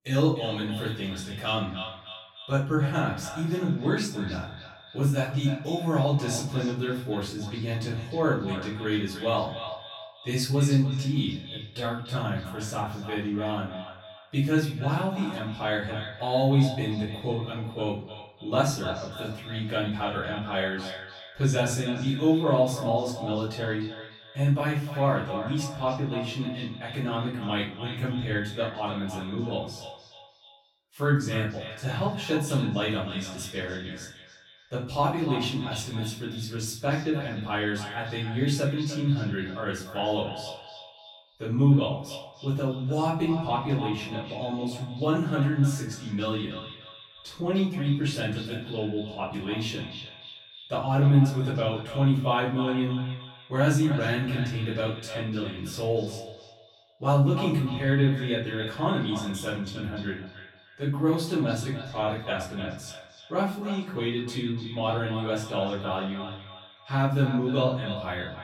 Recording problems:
off-mic speech; far
echo of what is said; noticeable; throughout; 300 ms later, 15 dB below the speech
room echo; noticeable; dies away in 0.5 s

